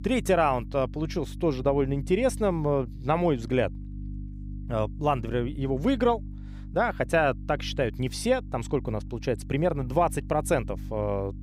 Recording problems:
electrical hum; faint; throughout; 50 Hz, 25 dB below the speech

